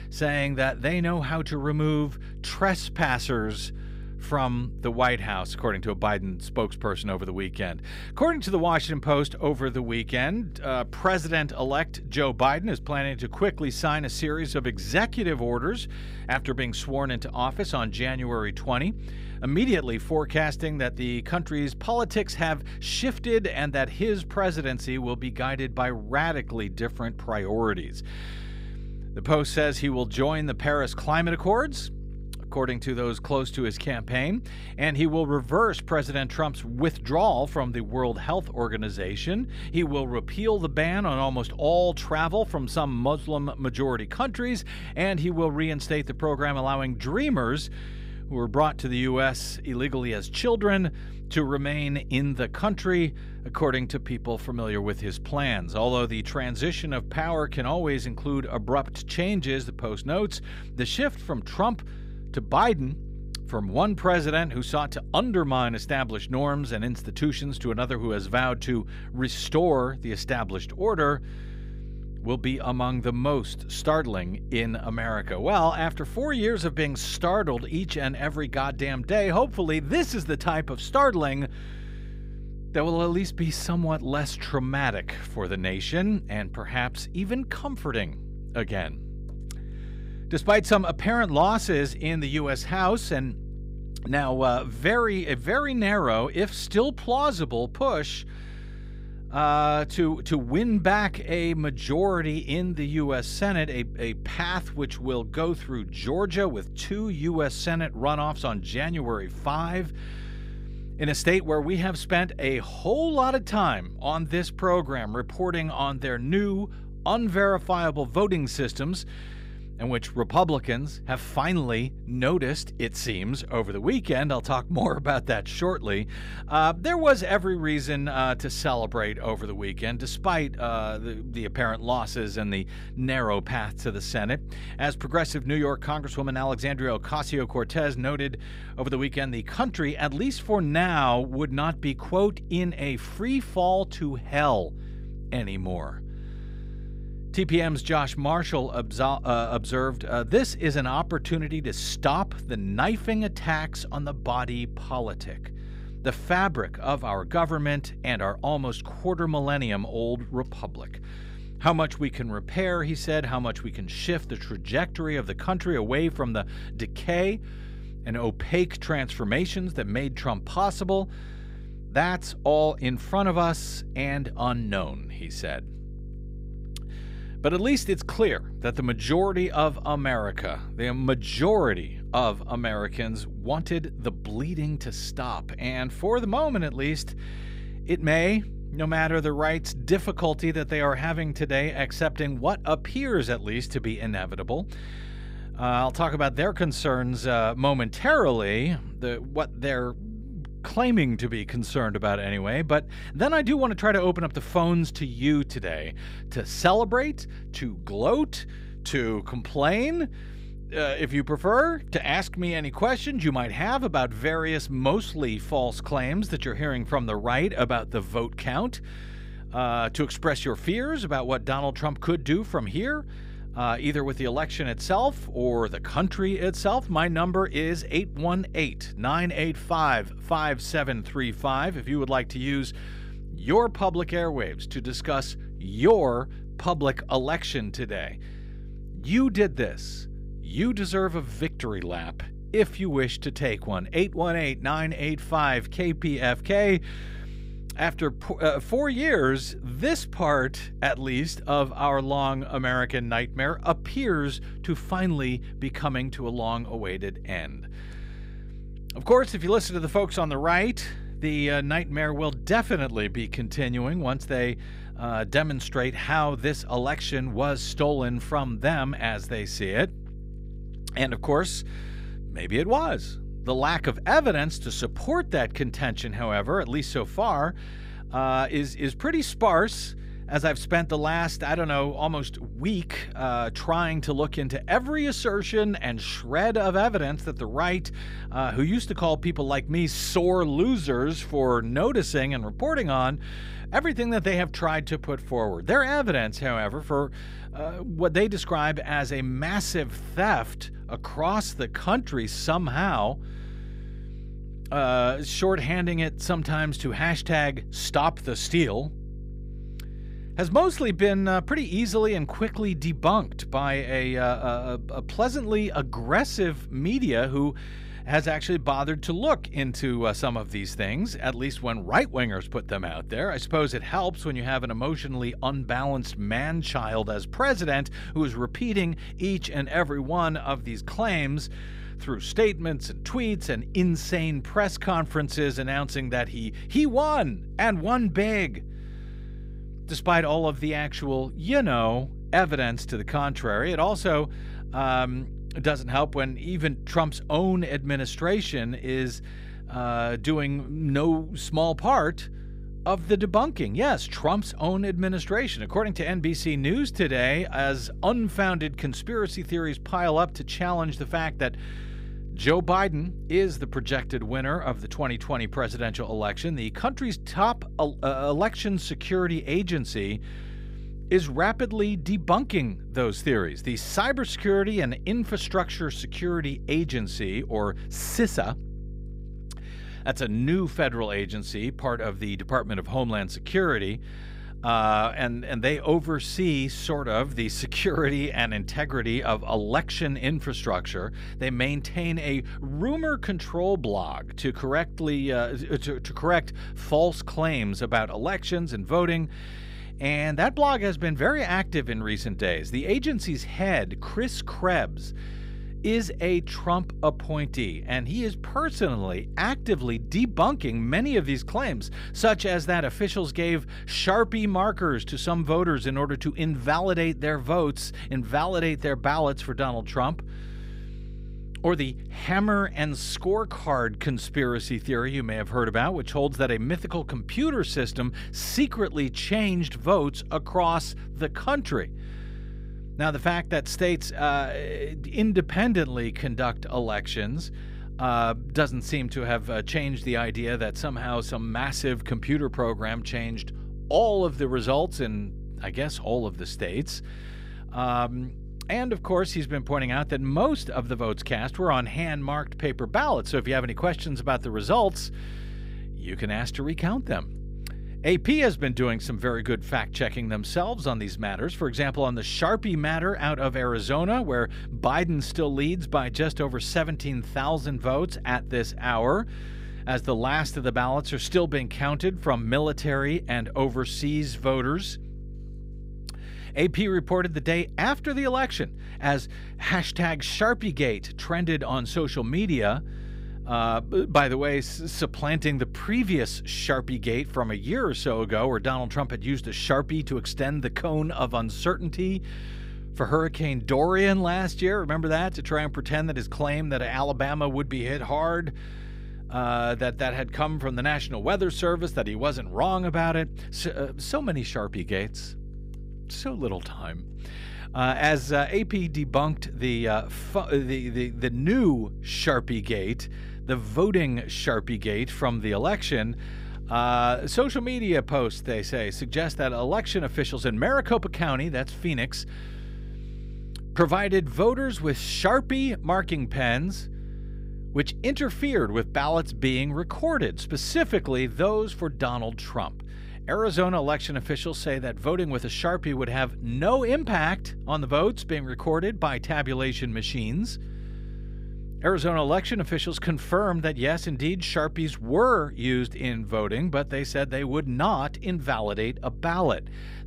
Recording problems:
electrical hum; faint; throughout; 50 Hz, 25 dB below the speech

